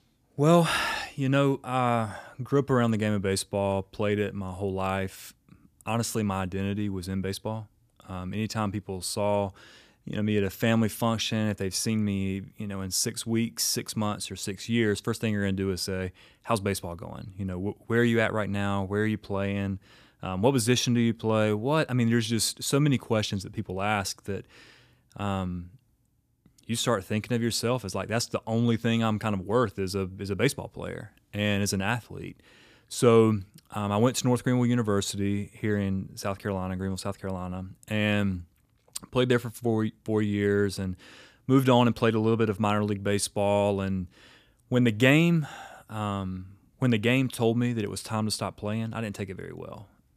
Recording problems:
none

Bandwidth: 14.5 kHz